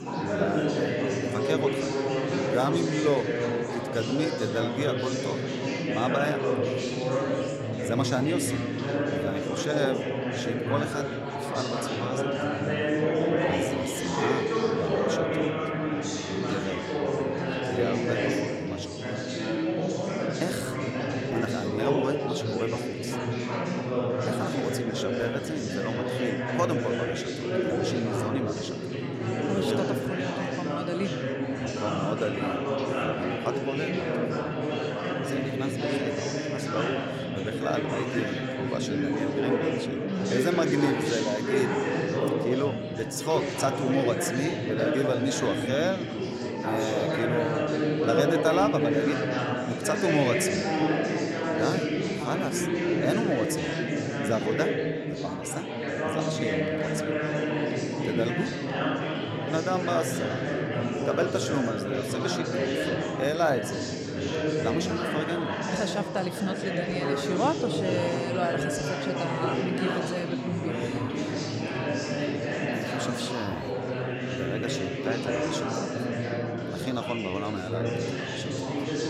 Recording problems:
chatter from many people; very loud; throughout; 3 dB above the speech
household noises; noticeable; throughout; 20 dB below the speech

